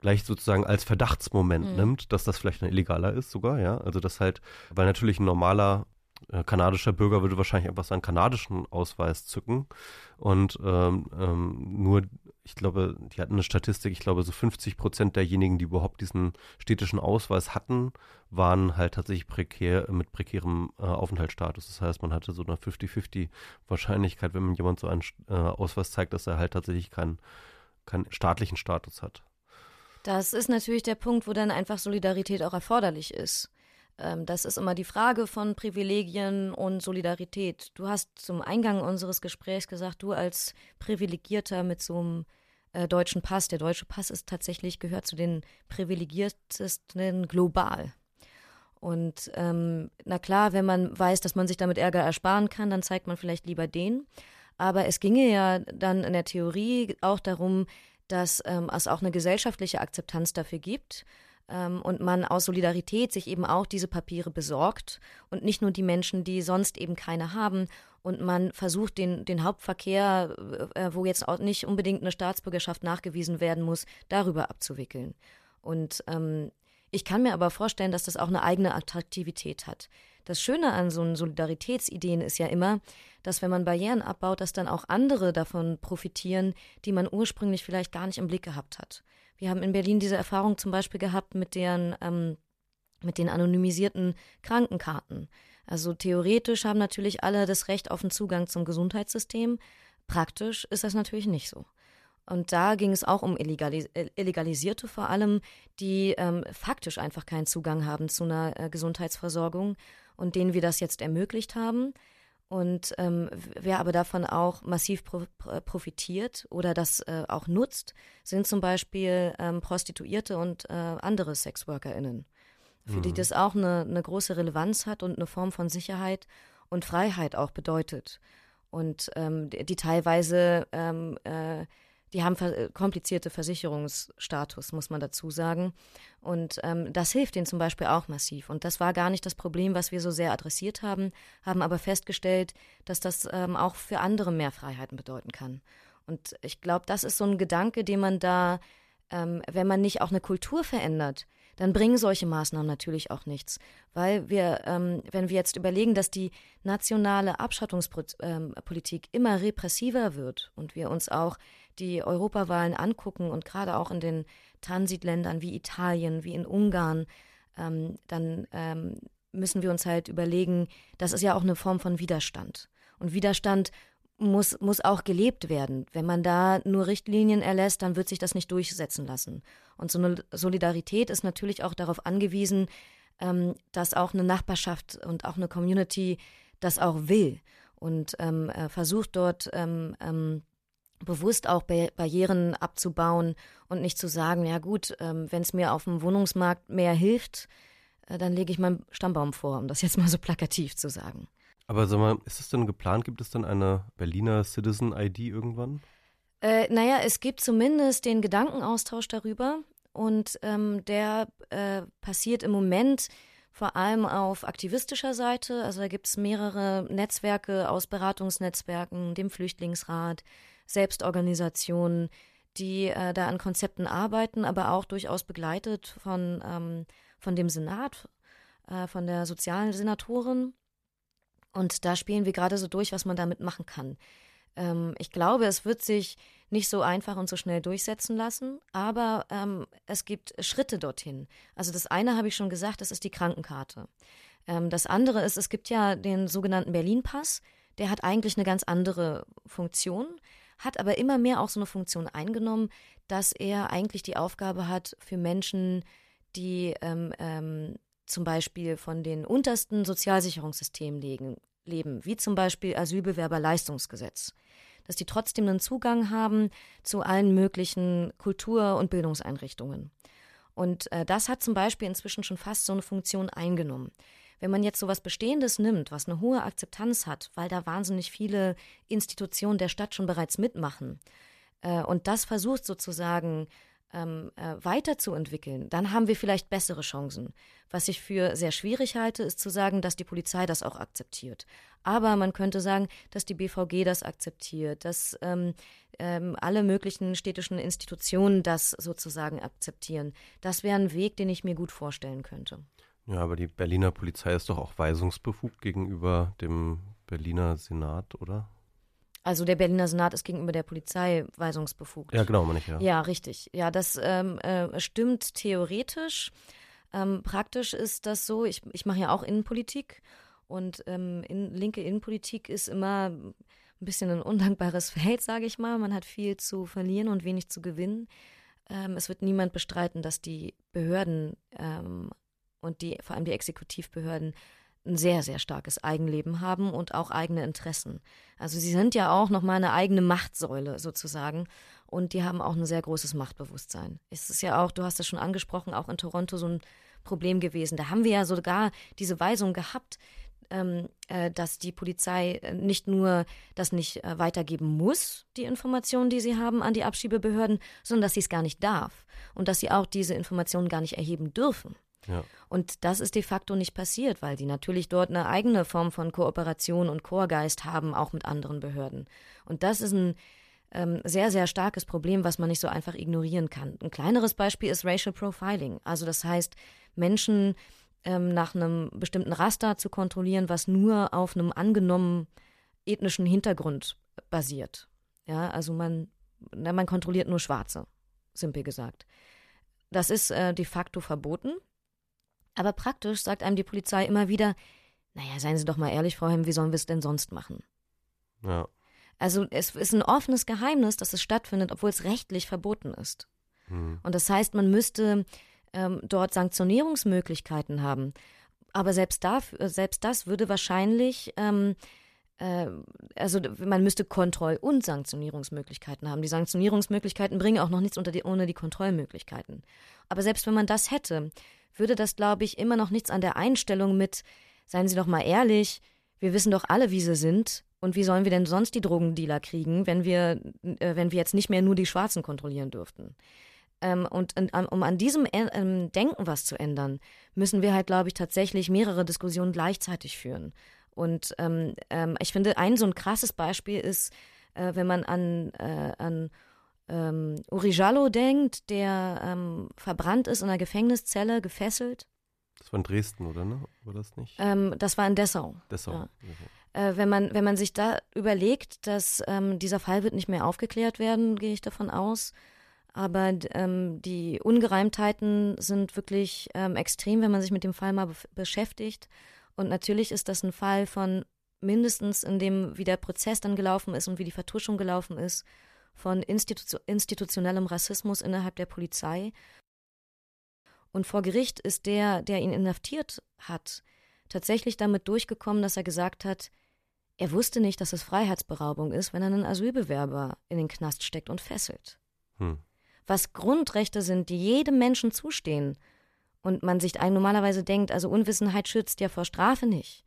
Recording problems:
none

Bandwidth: 14.5 kHz